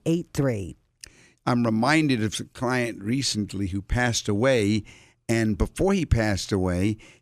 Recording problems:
none

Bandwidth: 14.5 kHz